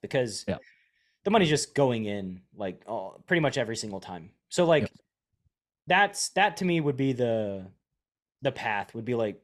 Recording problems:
none

